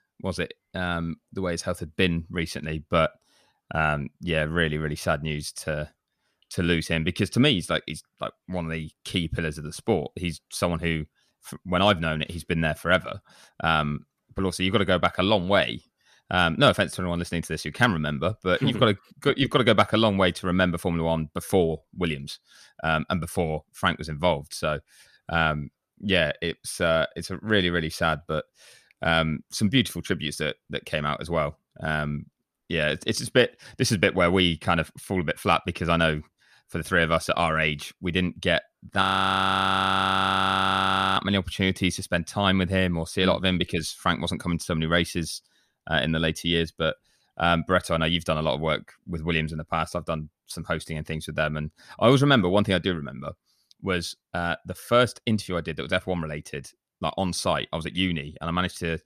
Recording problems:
audio freezing; at 39 s for 2 s

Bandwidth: 14.5 kHz